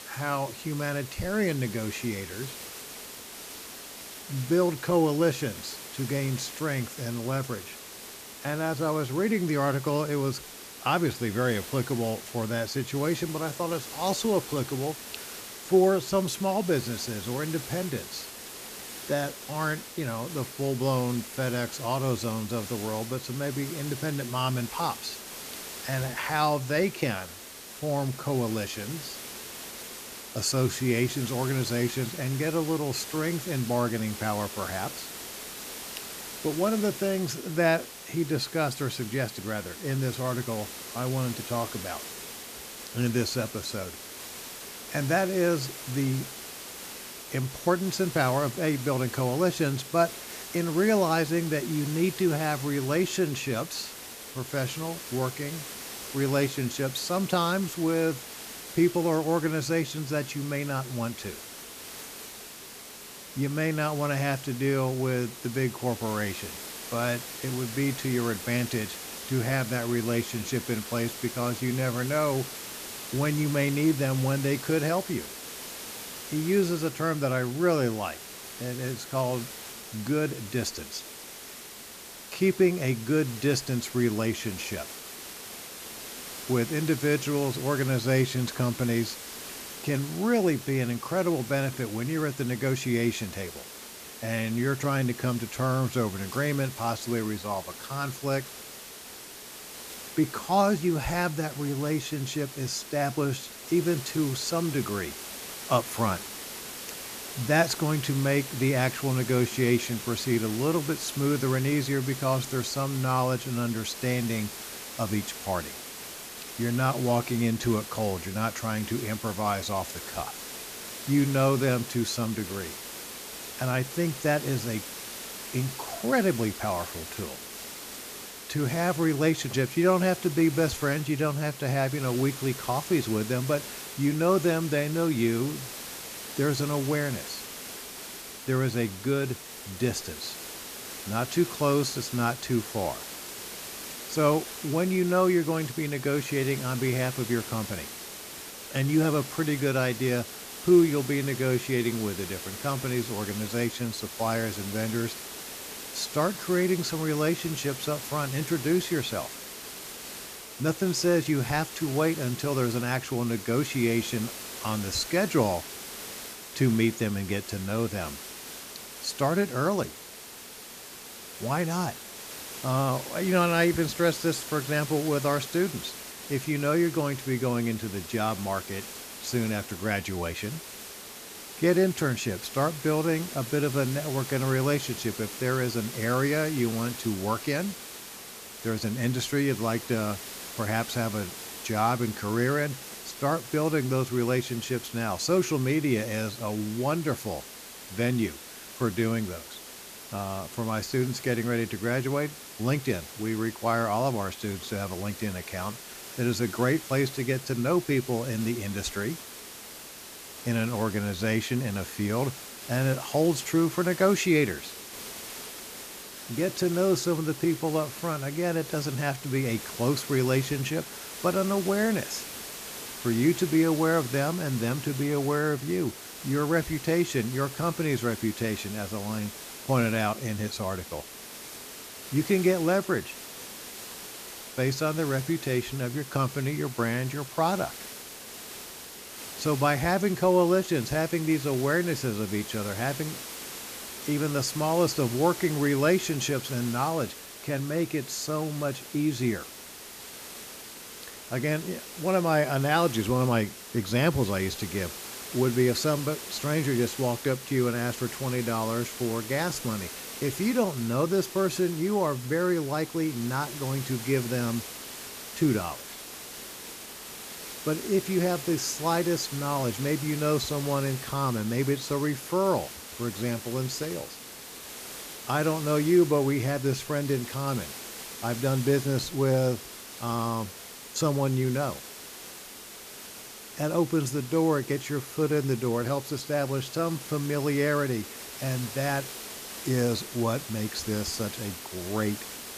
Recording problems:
hiss; noticeable; throughout; 10 dB below the speech

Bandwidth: 14.5 kHz